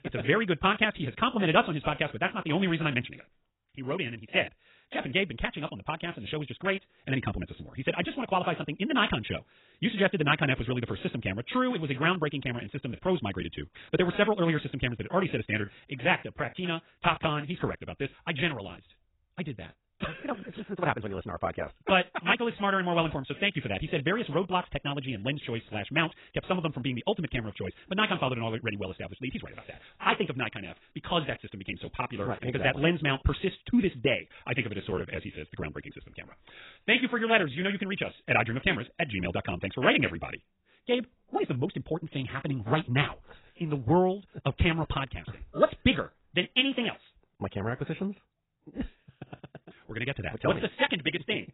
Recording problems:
garbled, watery; badly; nothing above 3.5 kHz
wrong speed, natural pitch; too fast; 1.6 times normal speed
uneven, jittery; strongly; from 14 to 42 s

